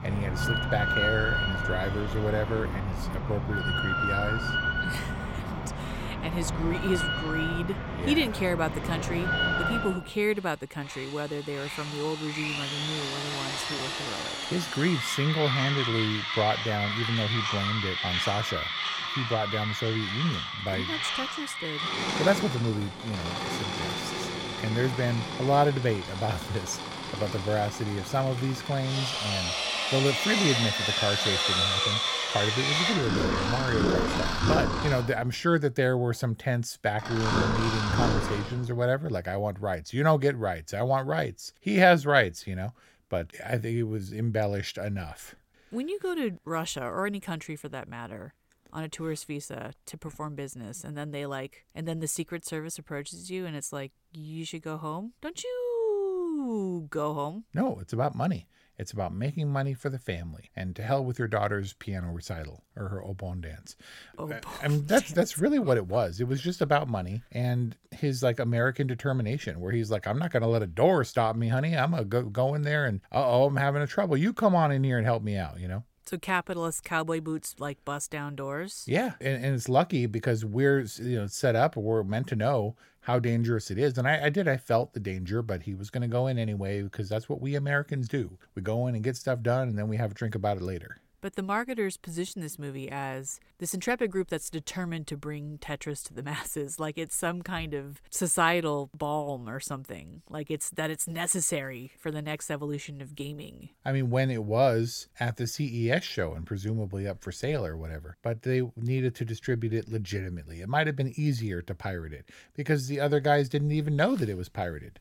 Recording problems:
machinery noise; very loud; until 38 s; as loud as the speech

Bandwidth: 16.5 kHz